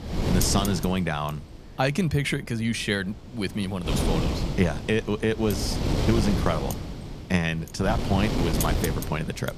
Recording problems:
wind noise on the microphone; heavy; 4 dB below the speech

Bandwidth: 14.5 kHz